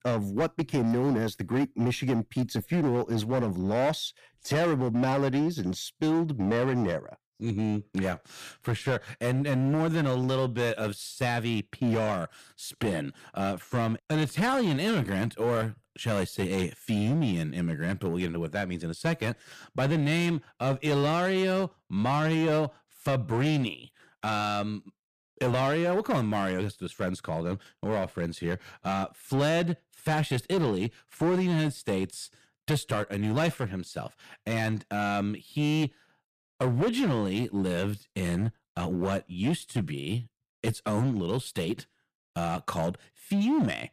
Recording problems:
distortion; slight; 11% of the sound clipped

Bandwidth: 14.5 kHz